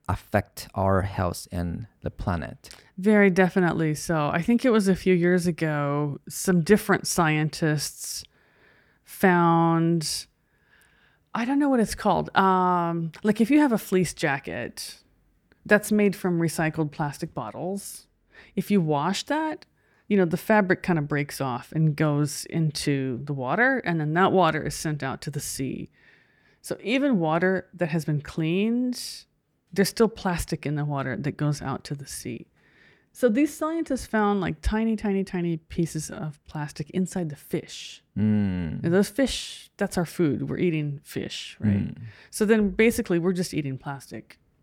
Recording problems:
none

